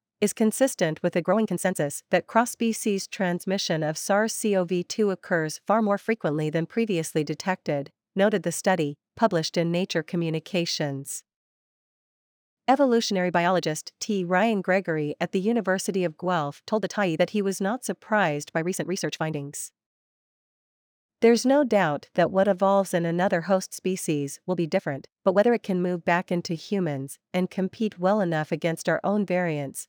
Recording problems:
uneven, jittery; strongly; from 1 to 28 s

